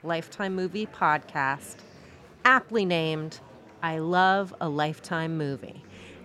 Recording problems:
murmuring crowd; faint; throughout; 25 dB below the speech

